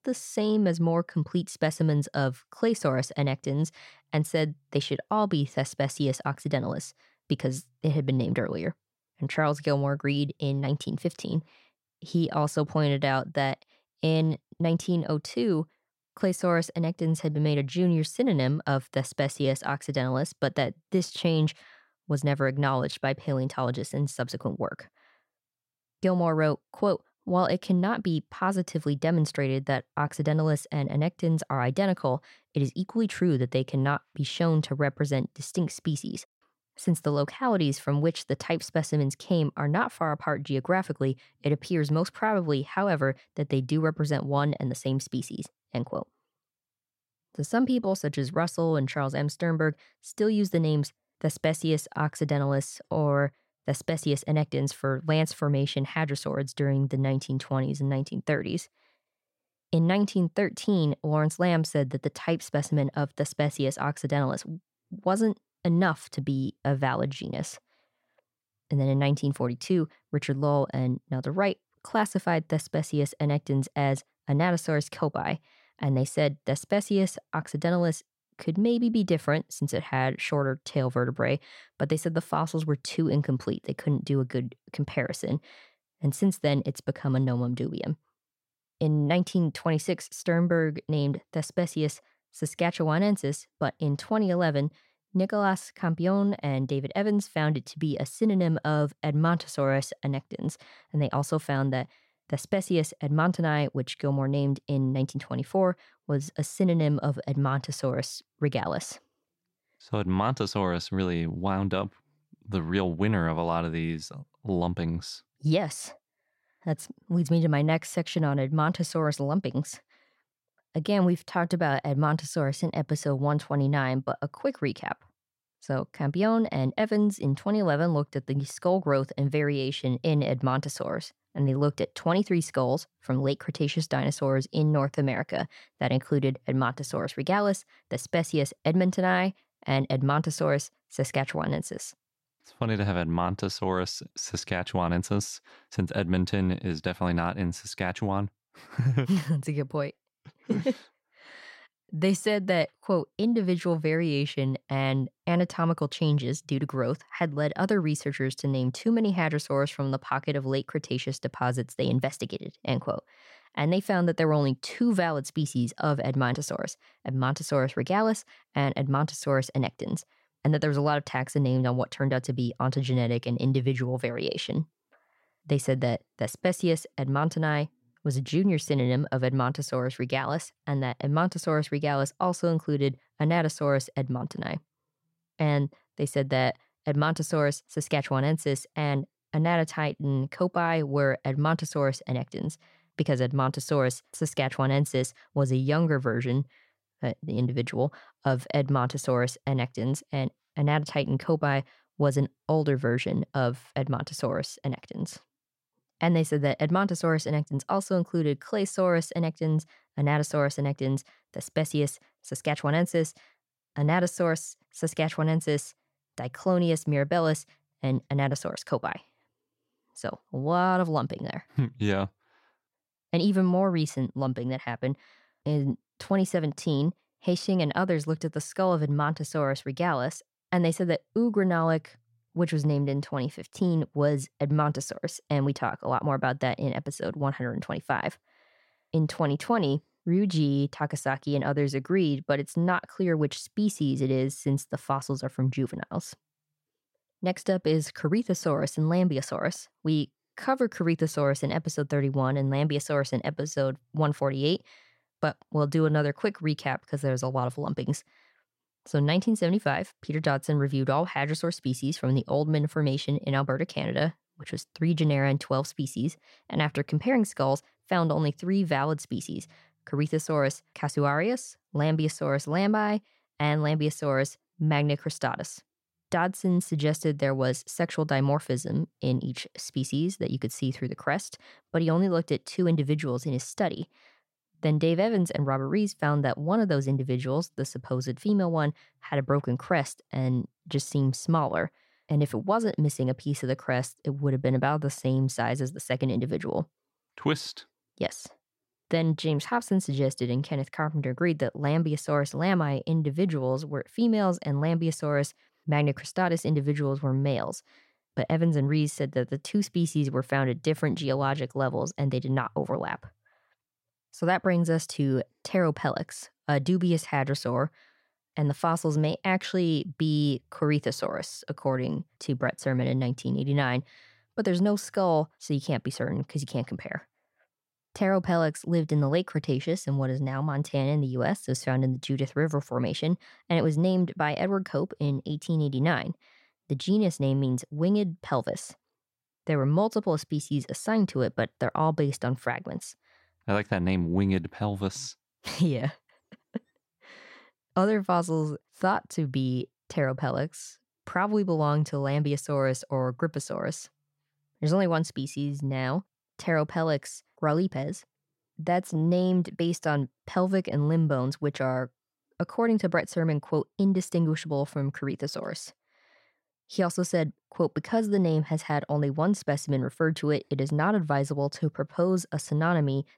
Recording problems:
none

